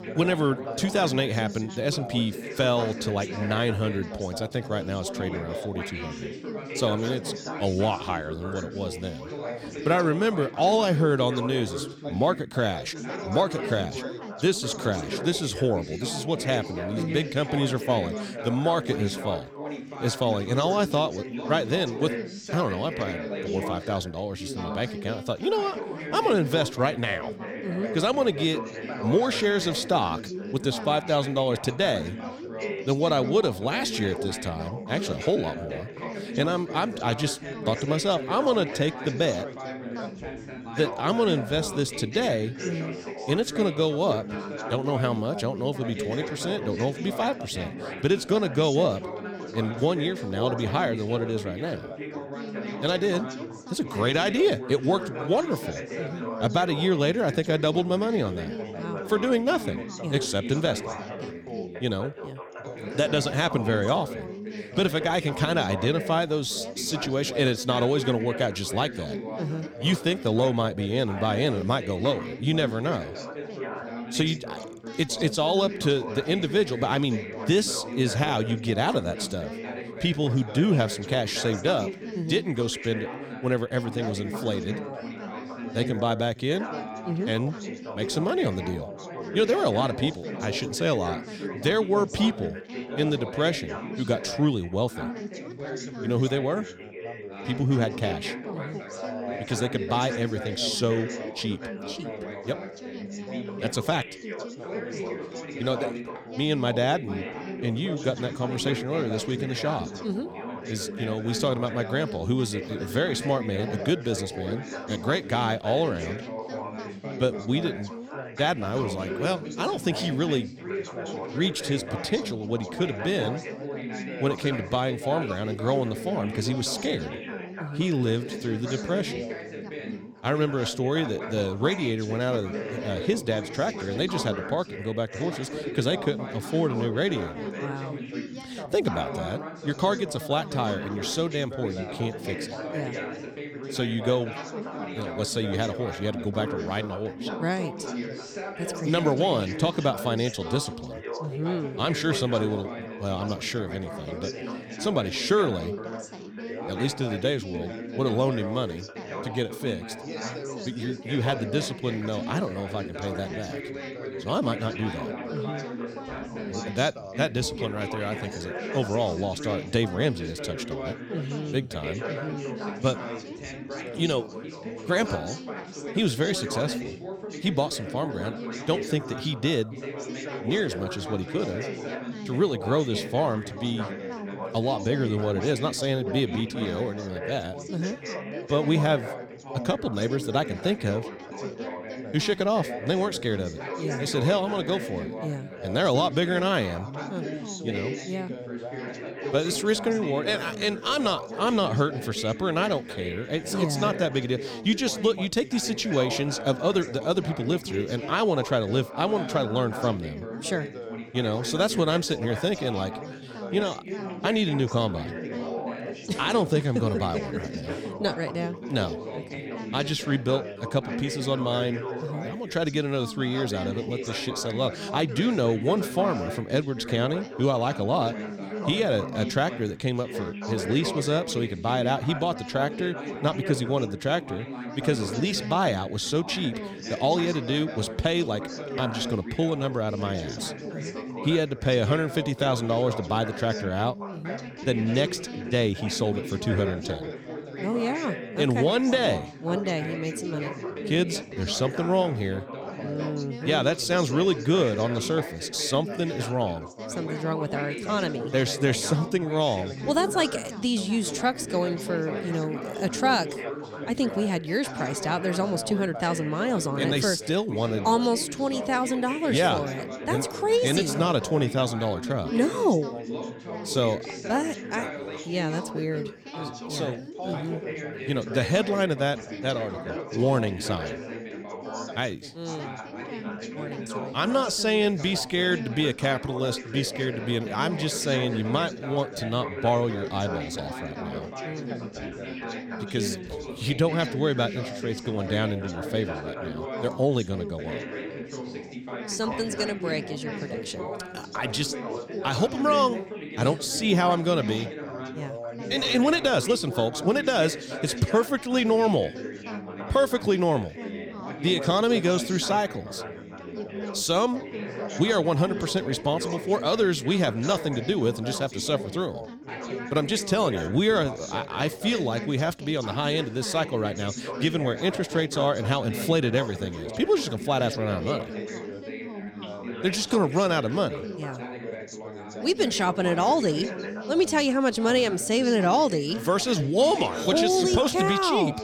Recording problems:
background chatter; loud; throughout; 4 voices, 8 dB below the speech

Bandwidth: 17 kHz